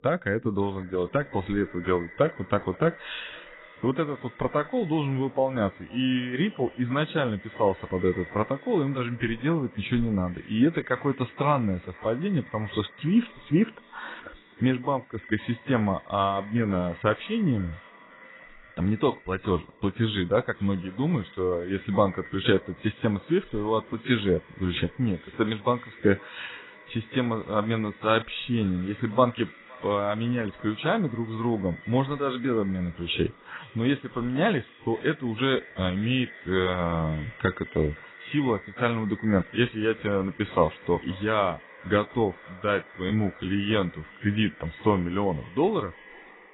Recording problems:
garbled, watery; badly; nothing above 4 kHz
echo of what is said; faint; throughout; 510 ms later, 20 dB below the speech

